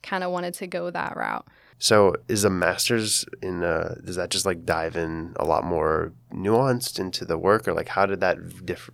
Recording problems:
none

